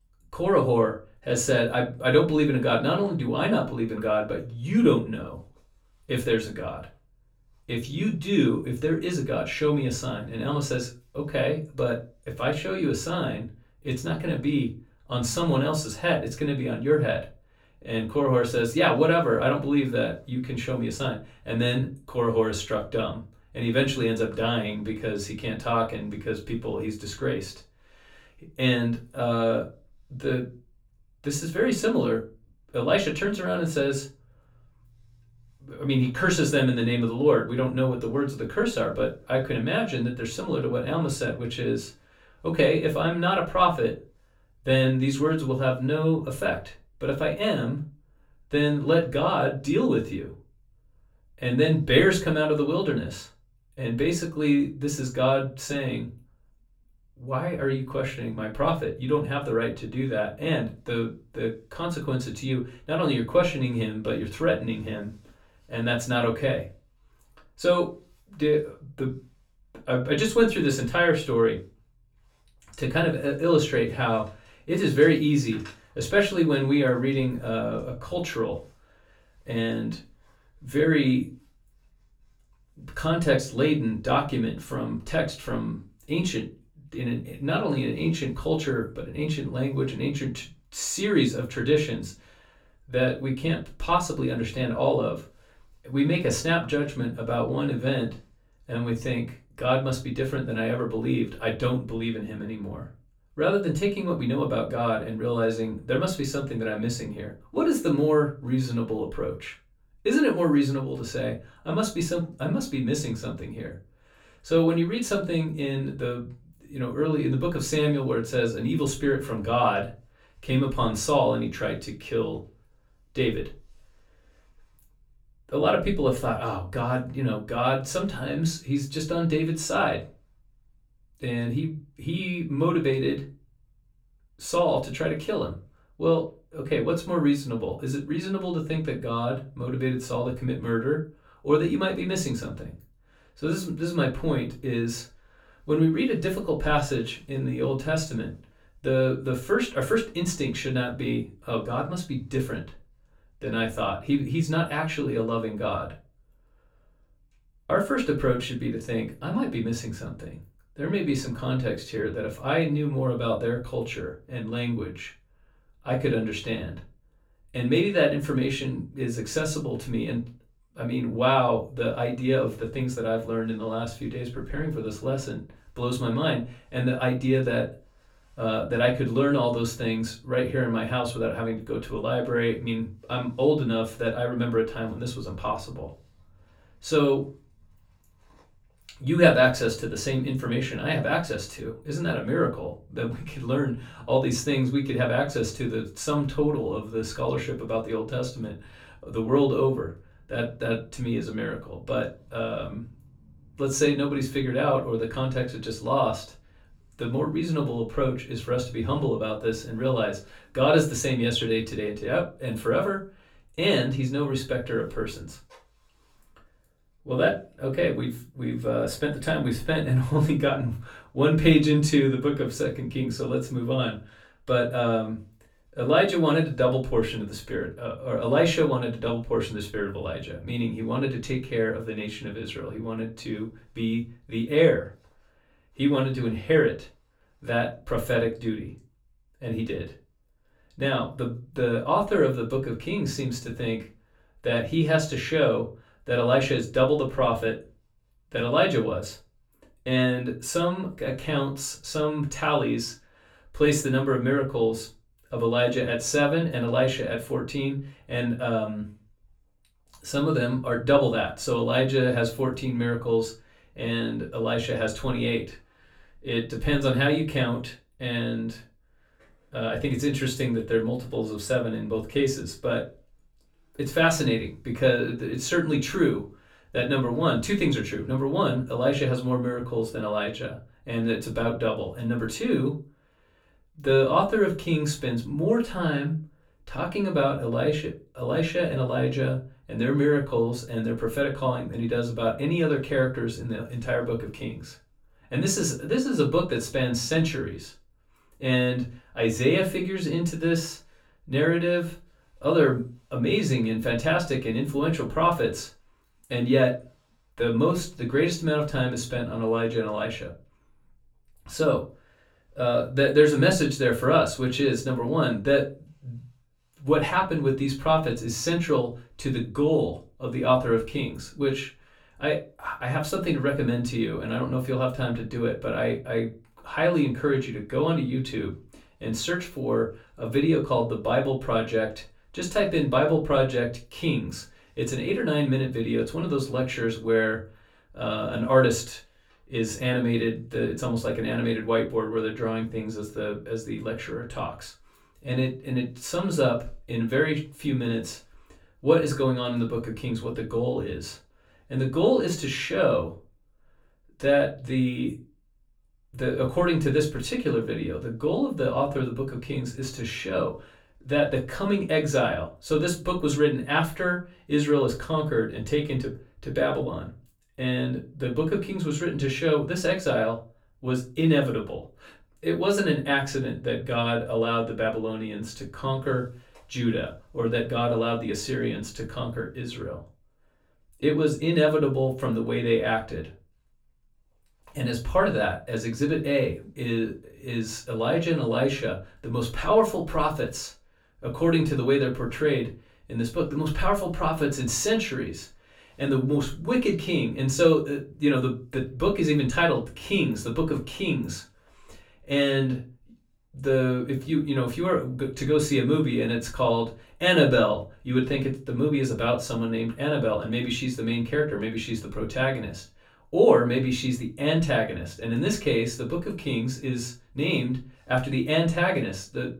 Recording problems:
off-mic speech; far
room echo; very slight; dies away in 0.2 s

